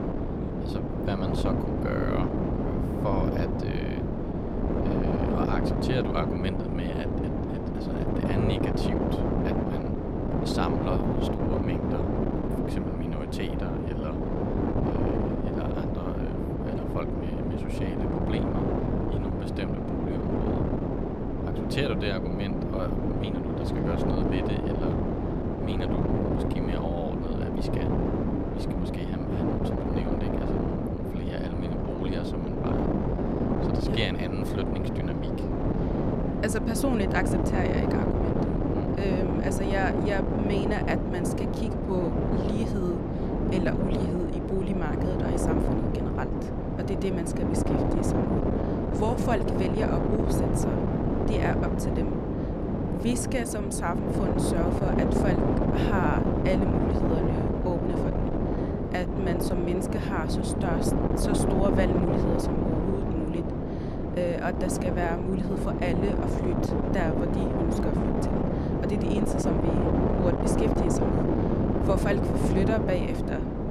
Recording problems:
wind noise on the microphone; heavy; 3 dB above the speech

